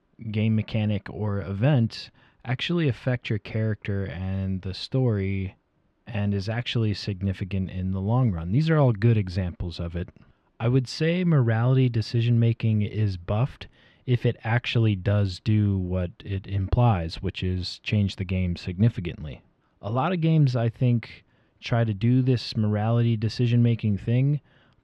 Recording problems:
muffled; slightly; fading above 2.5 kHz

